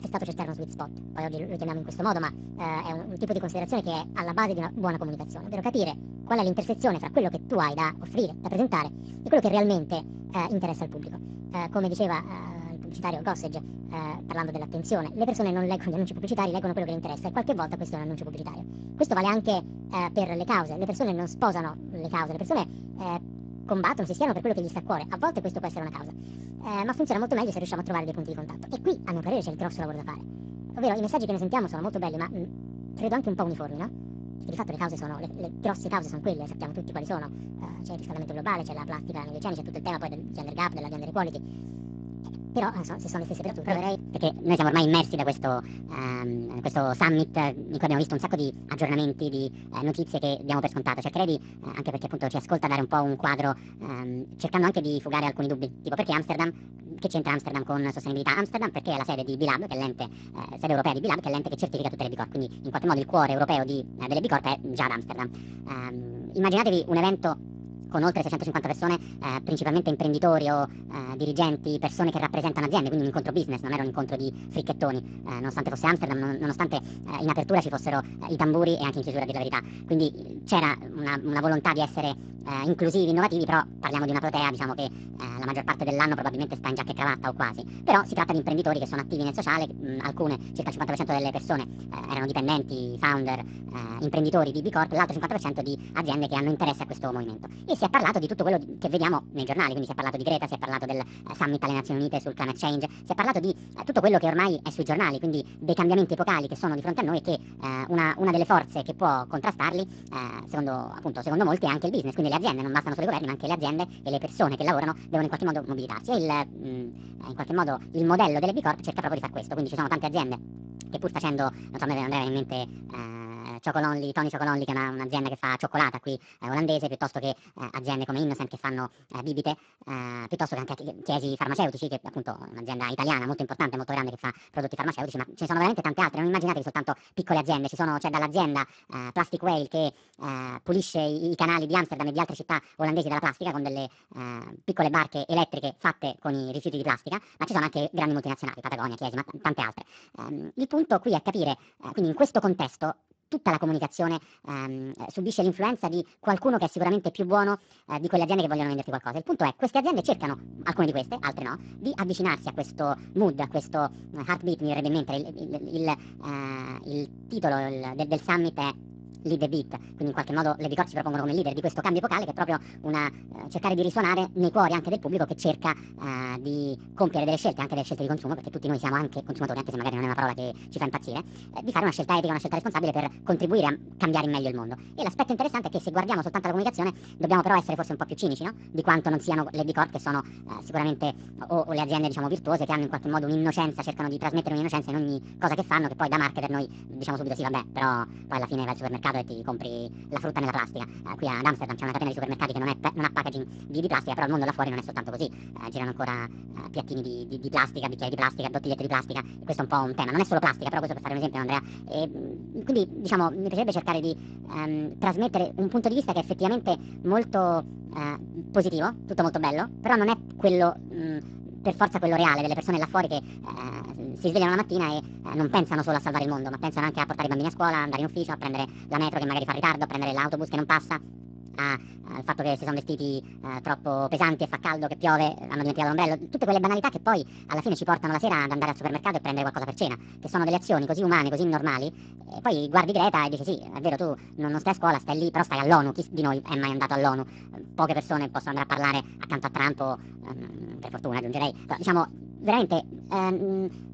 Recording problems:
garbled, watery; badly; nothing above 7.5 kHz
wrong speed and pitch; too fast and too high; 1.6 times normal speed
electrical hum; faint; until 2:03 and from 2:40 on; 60 Hz, 20 dB below the speech

